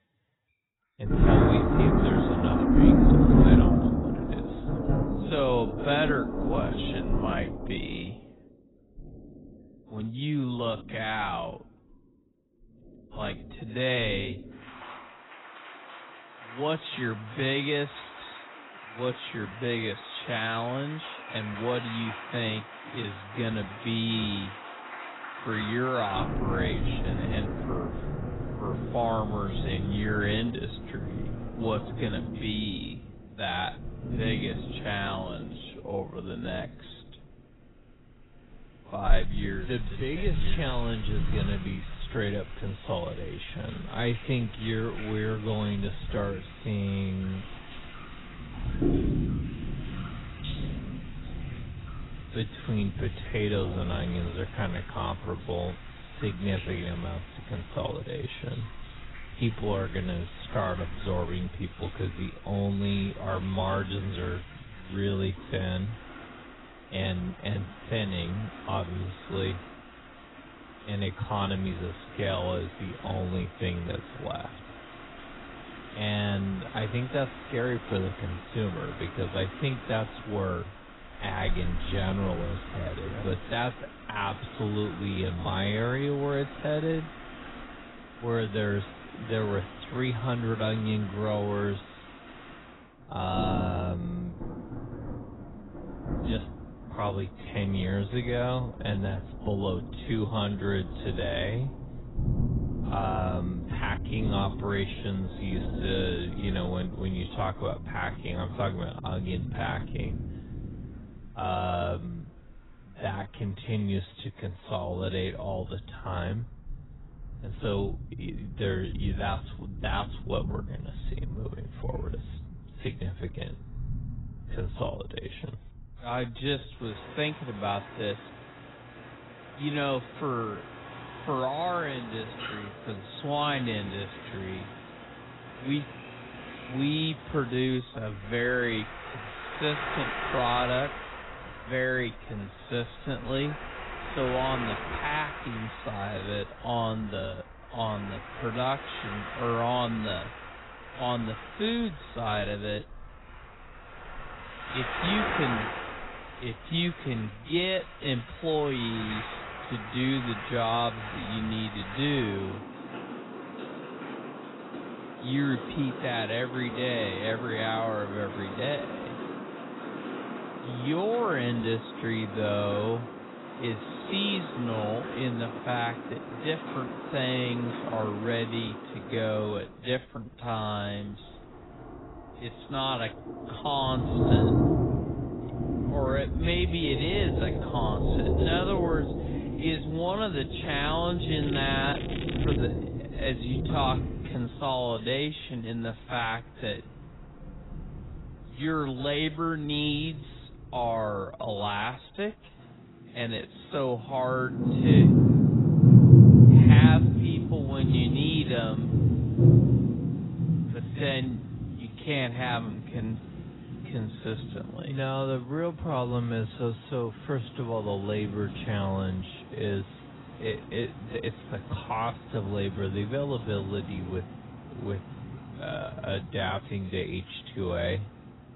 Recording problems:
garbled, watery; badly; nothing above 4 kHz
wrong speed, natural pitch; too slow; 0.6 times normal speed
rain or running water; very loud; throughout; 3 dB above the speech
crackling; loud; from 3:11 to 3:13; 9 dB below the speech

